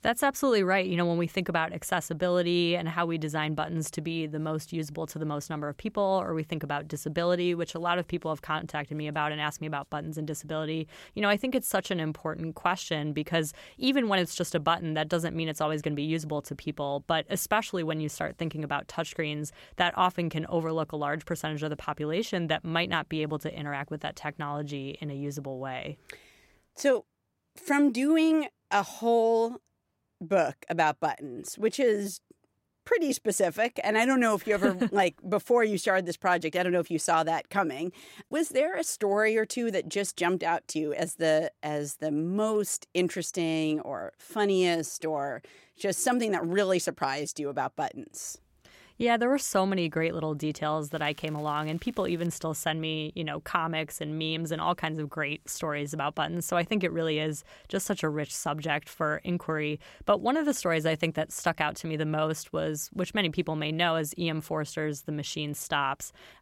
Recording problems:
crackling; faint; from 51 to 52 s; 25 dB below the speech

